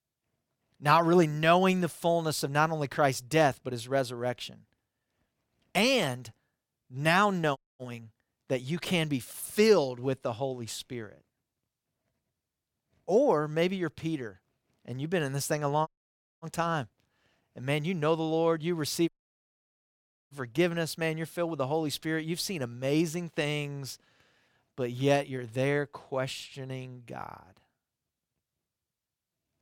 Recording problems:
audio cutting out; at 7.5 s, at 16 s for 0.5 s and at 19 s for 1 s

